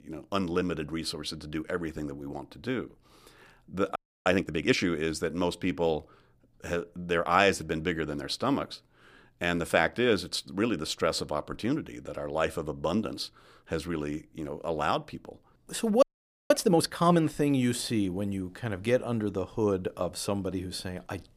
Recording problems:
audio freezing; at 4 s and at 16 s

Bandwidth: 15 kHz